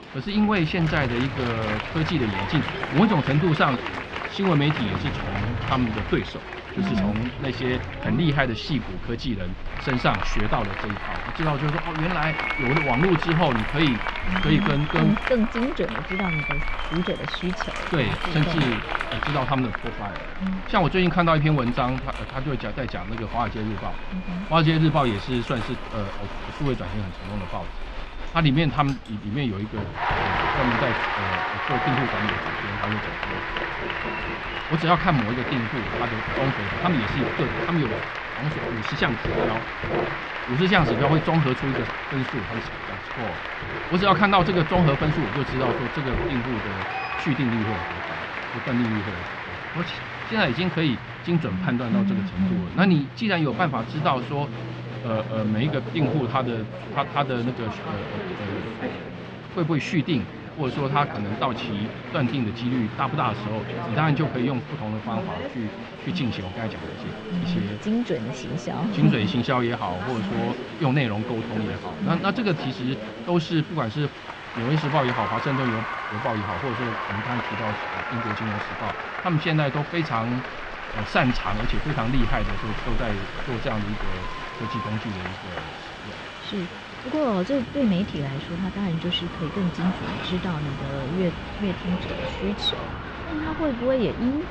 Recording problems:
muffled; slightly; fading above 3.5 kHz
crowd noise; loud; throughout; 6 dB below the speech
household noises; noticeable; throughout; 10 dB below the speech
rain or running water; noticeable; throughout; 20 dB below the speech

